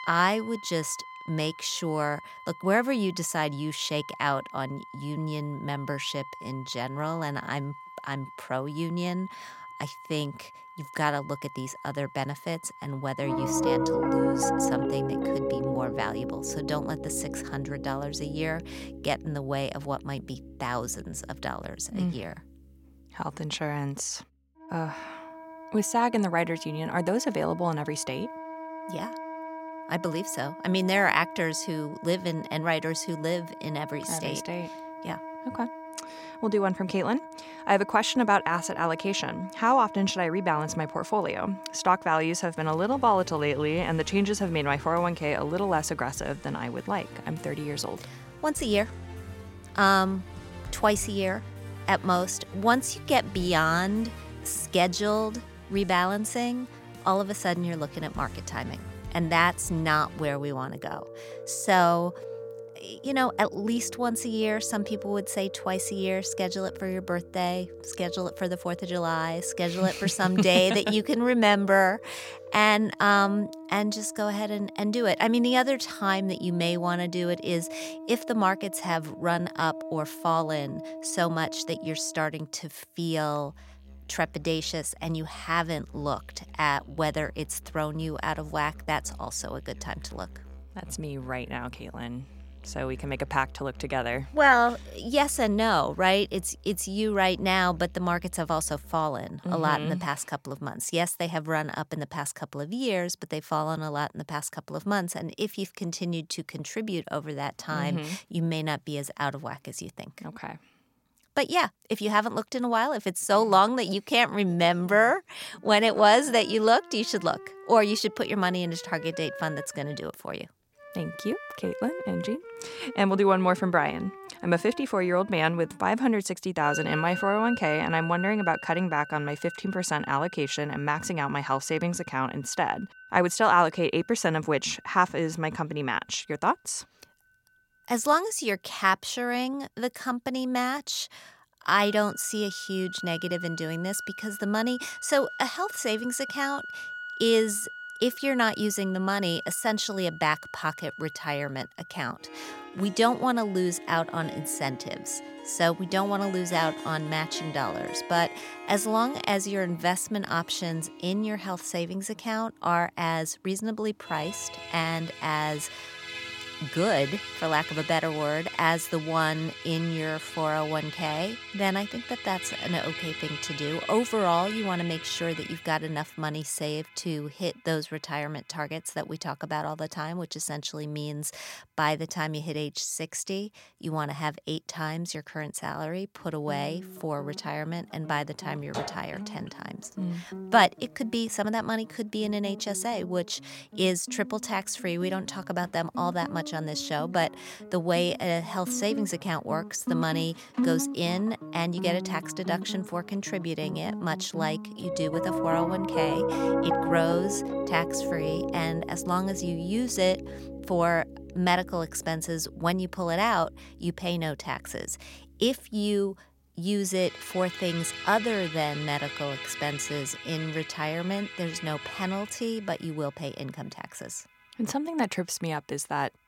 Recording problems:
background music; noticeable; throughout; 10 dB below the speech

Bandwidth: 16.5 kHz